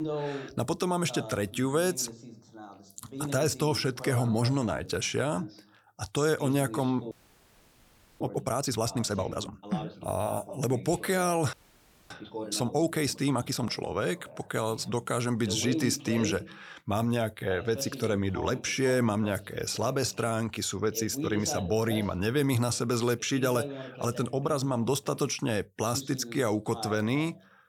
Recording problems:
voice in the background; noticeable; throughout; 10 dB below the speech
audio freezing; at 7 s for 1 s and at 12 s for 0.5 s

